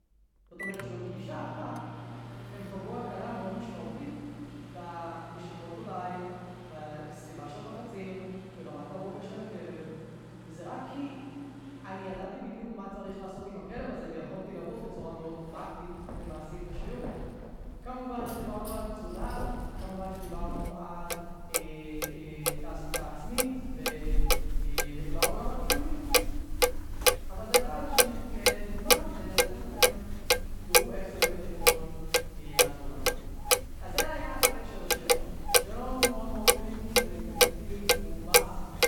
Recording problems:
room echo; strong; dies away in 2.6 s
off-mic speech; far
household noises; very loud; throughout; 15 dB above the speech

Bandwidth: 18.5 kHz